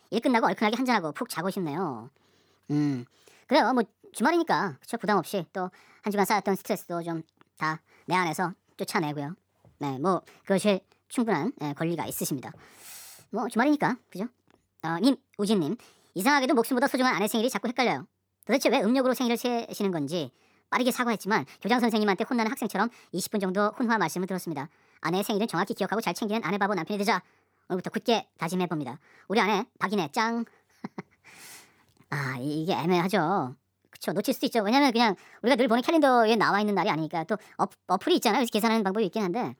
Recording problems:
wrong speed and pitch; too fast and too high; 1.5 times normal speed

